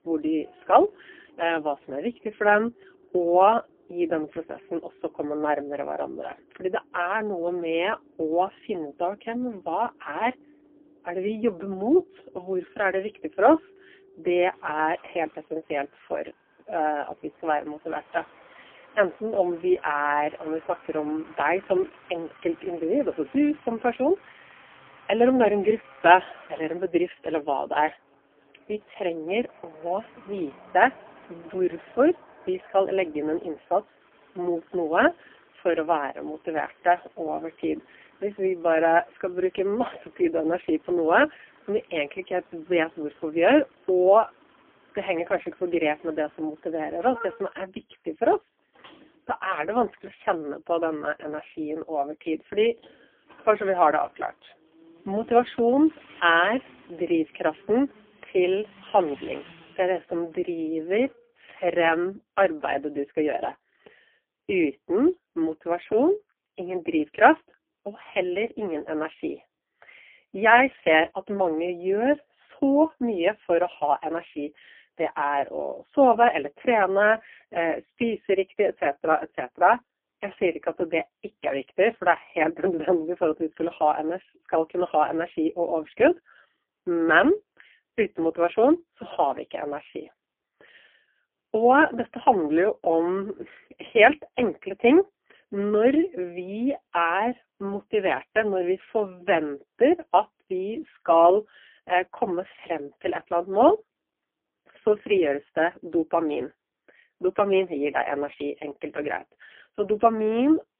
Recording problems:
phone-call audio; poor line; nothing above 3 kHz
traffic noise; faint; until 1:01; 25 dB below the speech

